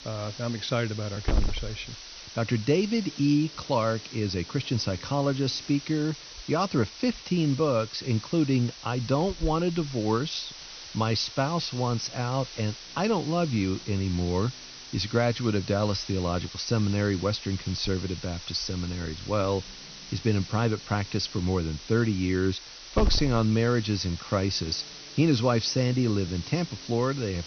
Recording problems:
high frequencies cut off; noticeable; nothing above 6 kHz
hiss; noticeable; throughout; 10 dB below the speech

